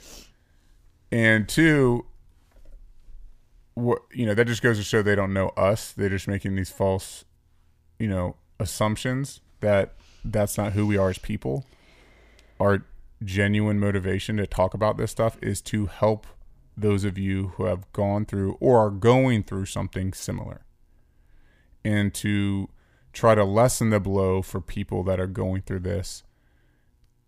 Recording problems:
uneven, jittery; slightly; from 4 to 18 s

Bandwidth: 15 kHz